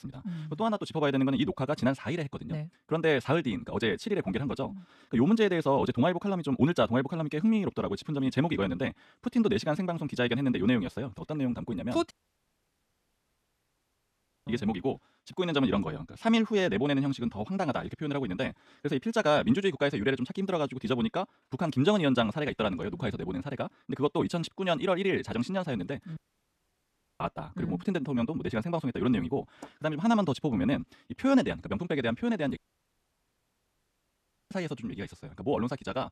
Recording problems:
wrong speed, natural pitch; too fast; 1.6 times normal speed
audio cutting out; at 12 s for 2.5 s, at 26 s for 1 s and at 33 s for 2 s

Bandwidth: 13.5 kHz